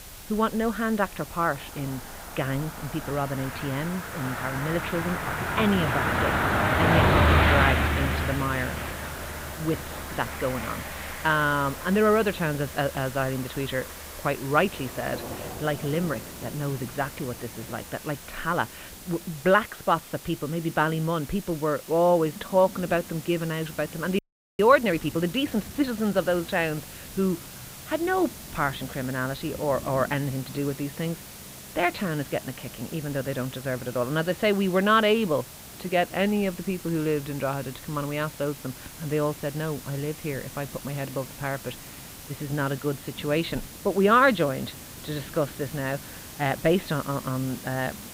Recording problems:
muffled; slightly; fading above 4 kHz
traffic noise; loud; throughout; 1 dB below the speech
hiss; noticeable; throughout; 15 dB below the speech
rain or running water; faint; throughout; 20 dB below the speech
audio freezing; at 24 s

